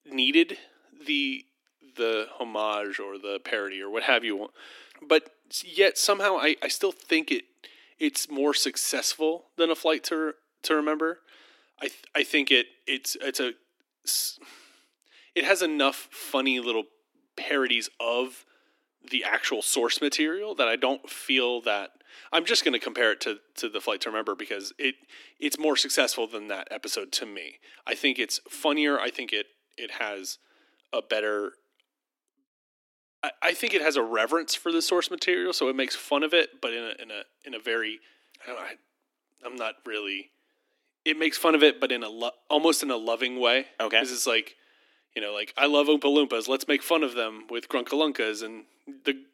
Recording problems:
thin; somewhat; fading below 300 Hz

